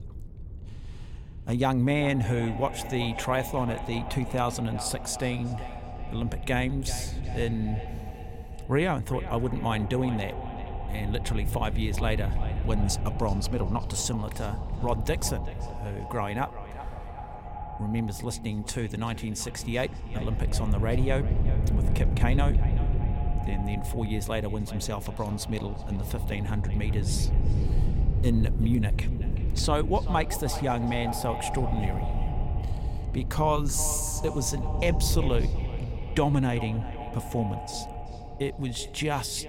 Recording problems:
echo of what is said; strong; throughout; 380 ms later, 10 dB below the speech
wind noise on the microphone; occasional gusts; 15 dB below the speech

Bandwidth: 16.5 kHz